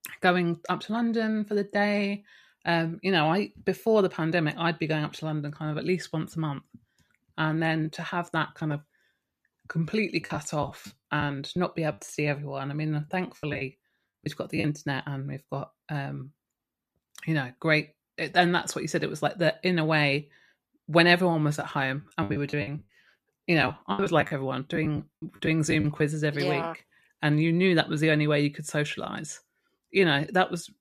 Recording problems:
choppy; very; from 10 to 12 s, from 14 to 15 s and from 22 to 26 s; 16% of the speech affected

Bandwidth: 14.5 kHz